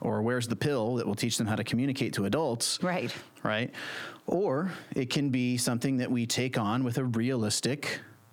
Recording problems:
squashed, flat; heavily

